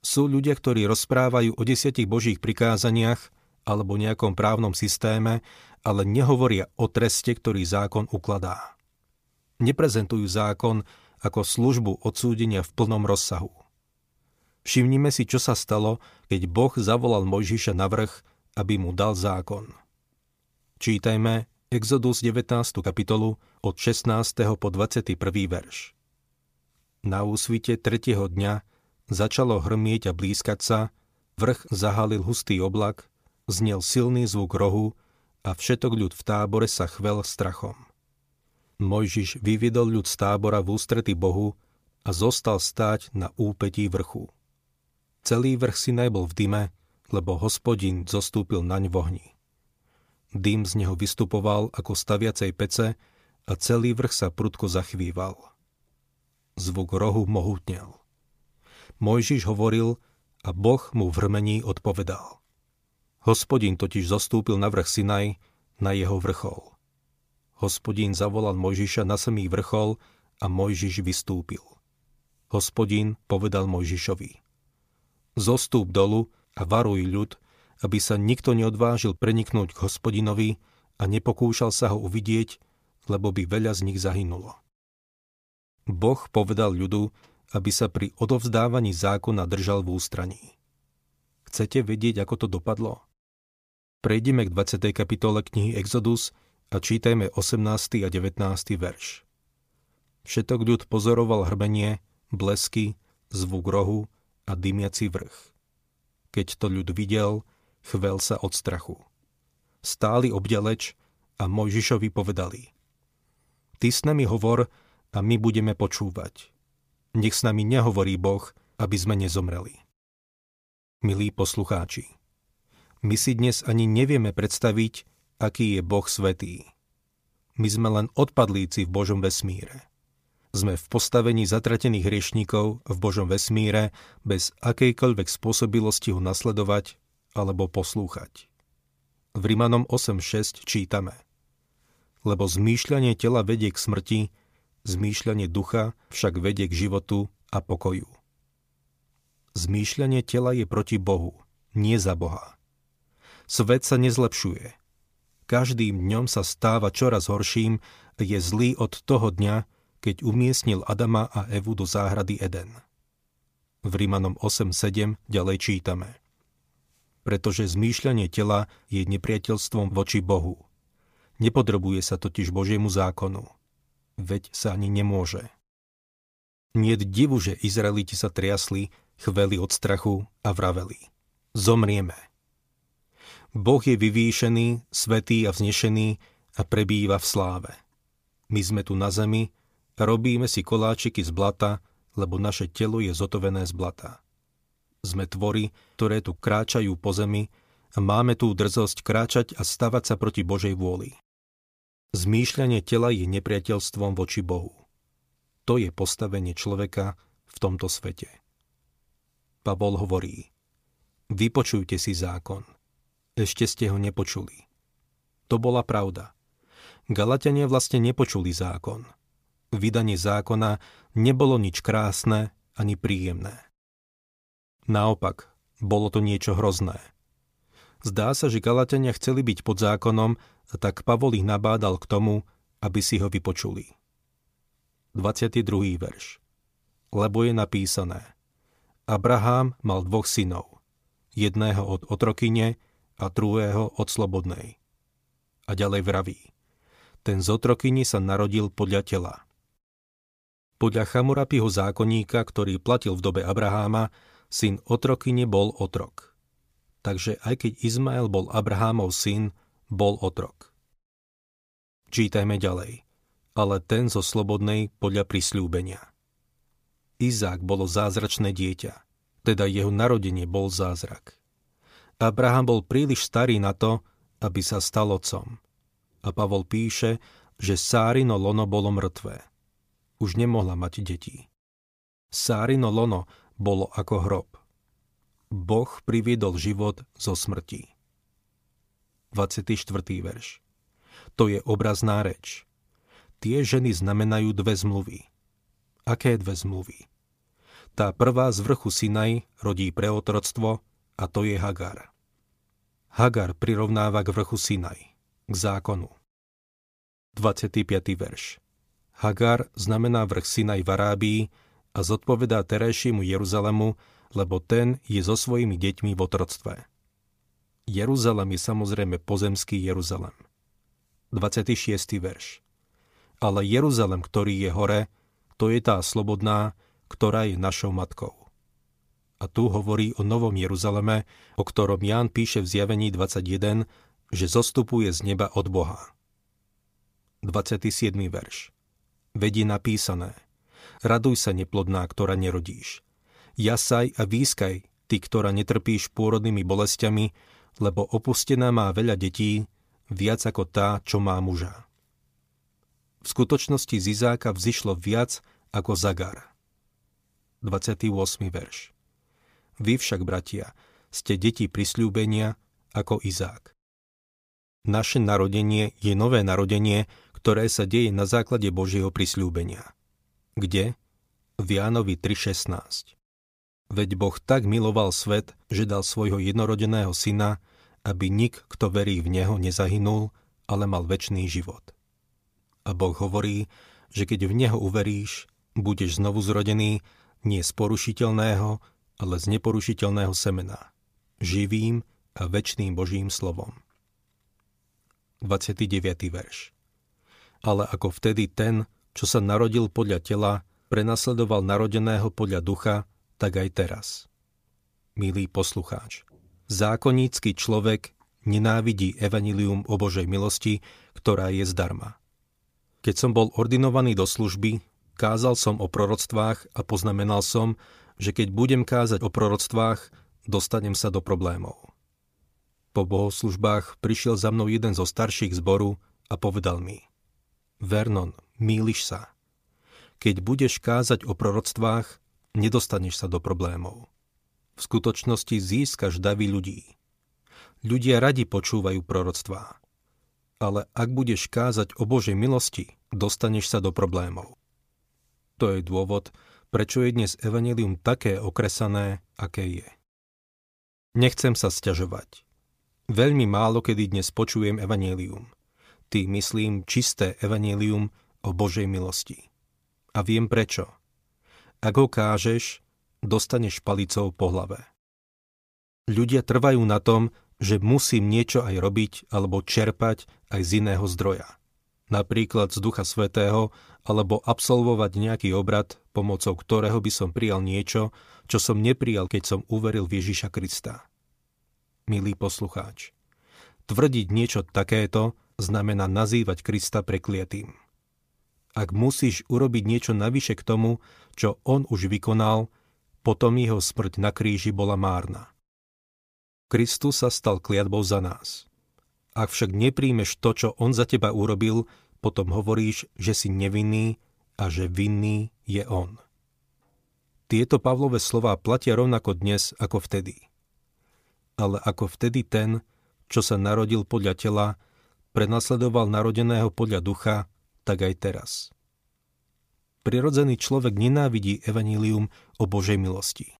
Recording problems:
none

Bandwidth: 15 kHz